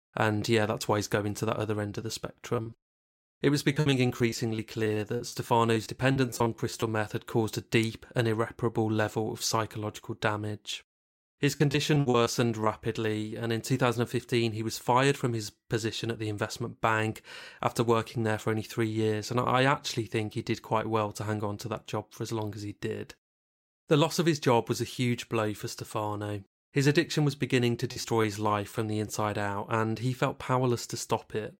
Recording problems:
choppy; very; from 2.5 to 7 s, from 12 to 13 s and at 28 s; 15% of the speech affected

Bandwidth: 16 kHz